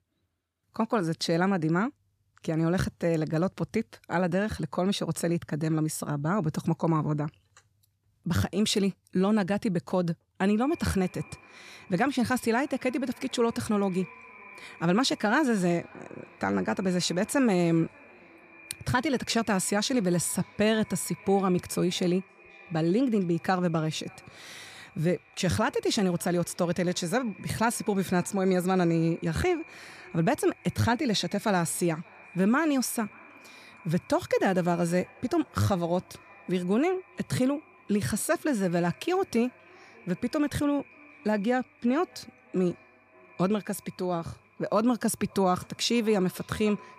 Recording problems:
echo of what is said; faint; from 11 s on; 580 ms later, 25 dB below the speech

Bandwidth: 14.5 kHz